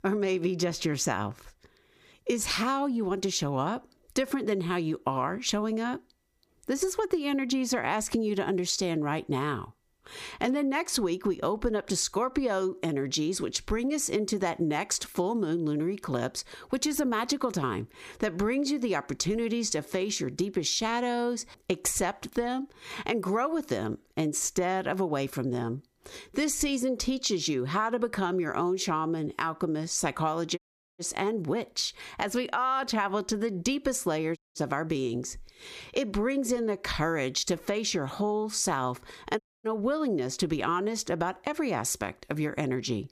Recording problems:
squashed, flat; somewhat
audio cutting out; at 31 s, at 34 s and at 39 s

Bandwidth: 15 kHz